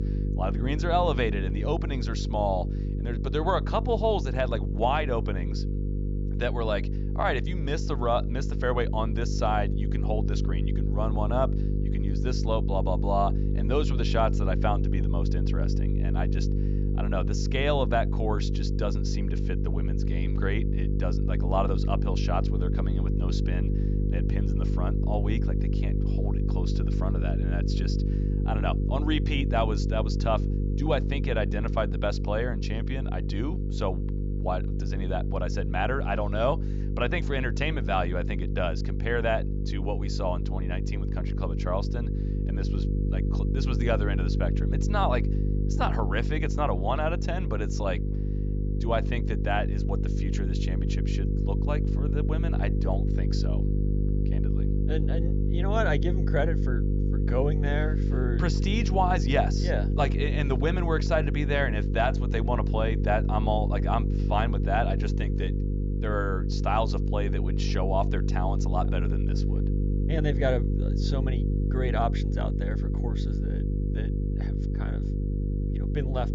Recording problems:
high frequencies cut off; noticeable; nothing above 7.5 kHz
electrical hum; loud; throughout; 50 Hz, 8 dB below the speech

